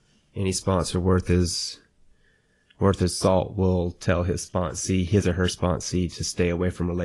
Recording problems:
garbled, watery; slightly; nothing above 10.5 kHz
abrupt cut into speech; at the end

